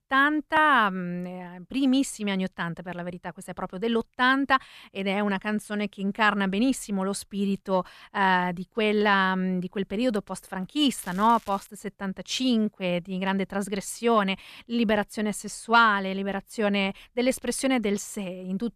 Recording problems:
crackling; faint; at 11 s; 25 dB below the speech

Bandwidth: 14.5 kHz